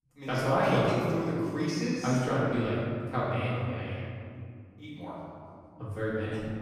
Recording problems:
room echo; strong; dies away in 2.4 s
off-mic speech; far

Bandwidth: 15 kHz